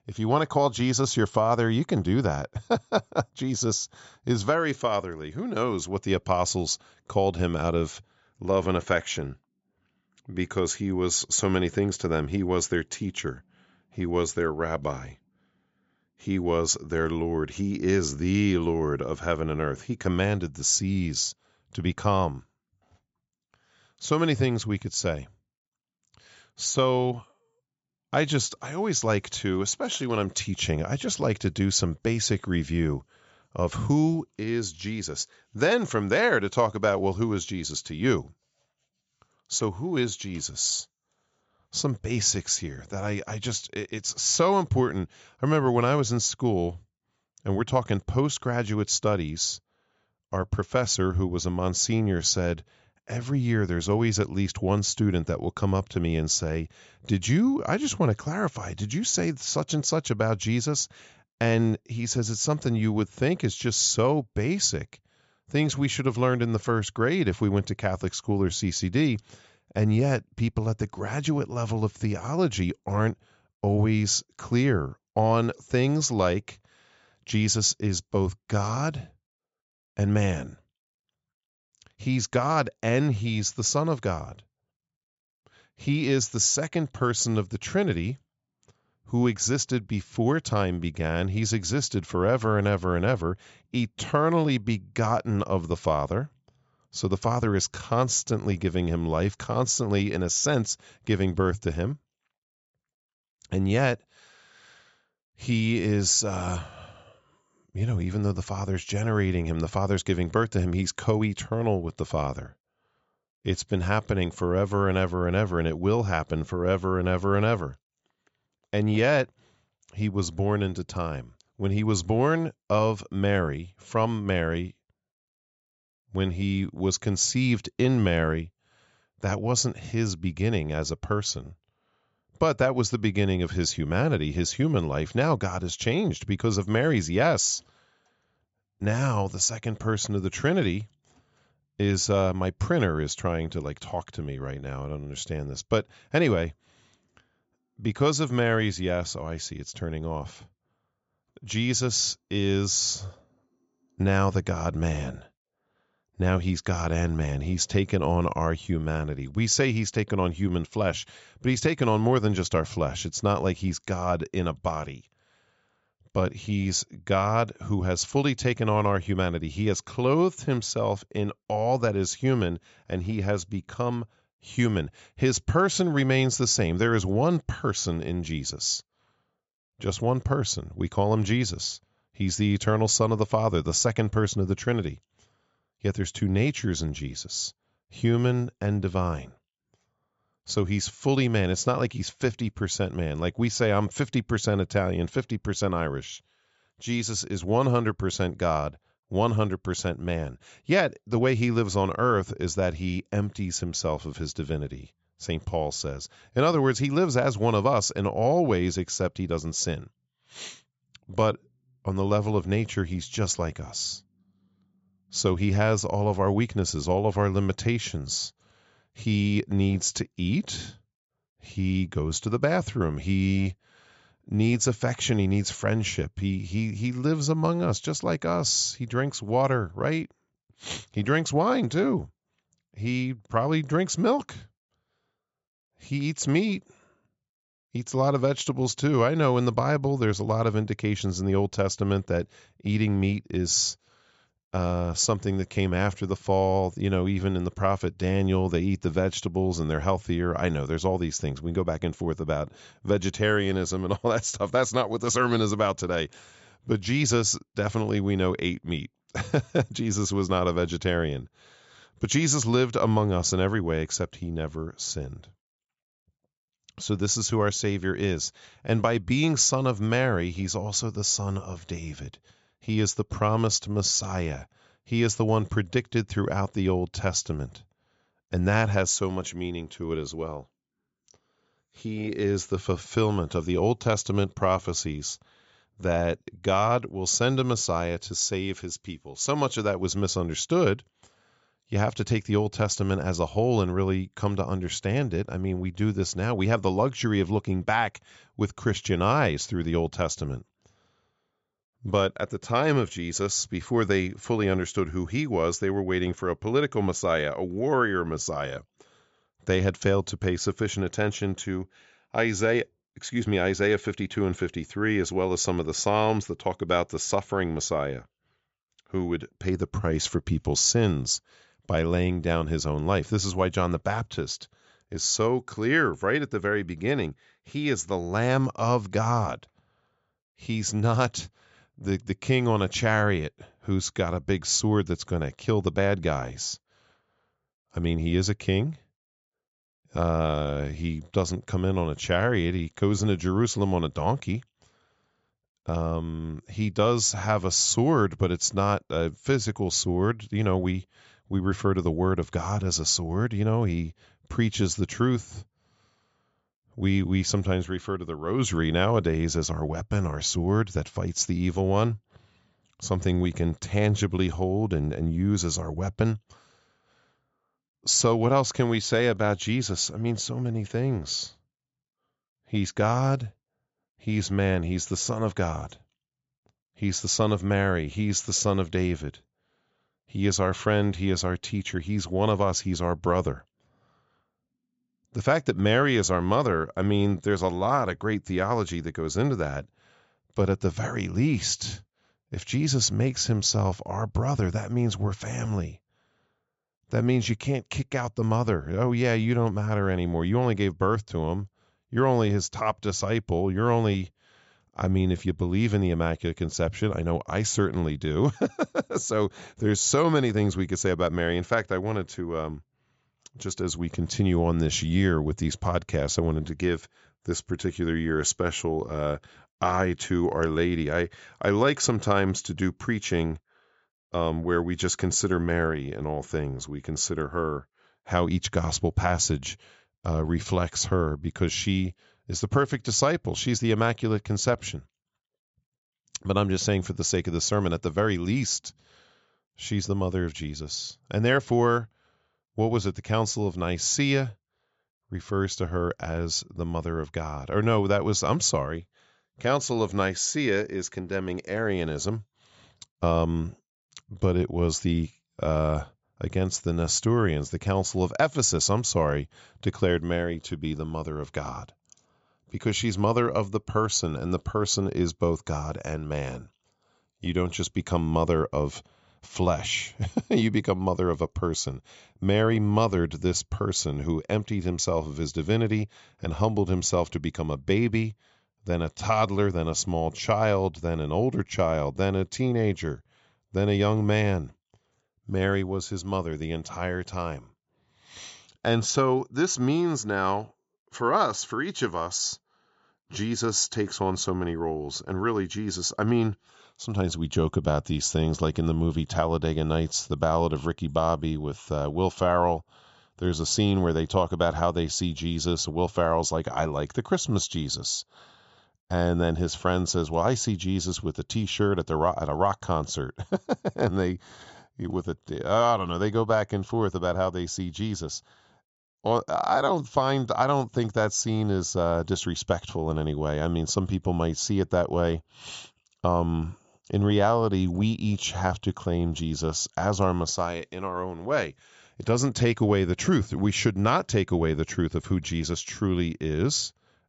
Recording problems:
high frequencies cut off; noticeable; nothing above 8 kHz

